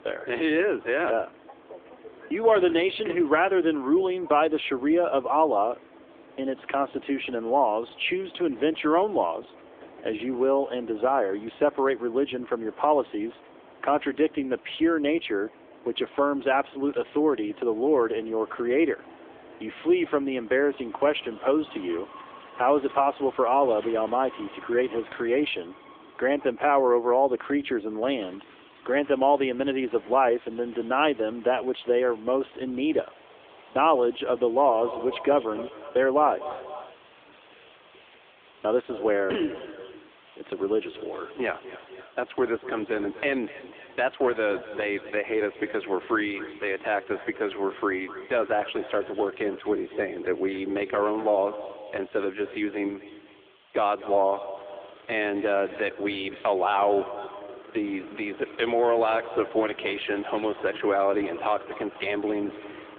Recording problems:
echo of what is said; noticeable; from 35 s on; 250 ms later, 15 dB below the speech
phone-call audio
traffic noise; faint; throughout; 25 dB below the speech
train or aircraft noise; faint; until 42 s; 25 dB below the speech
hiss; faint; from 28 to 55 s; 30 dB below the speech

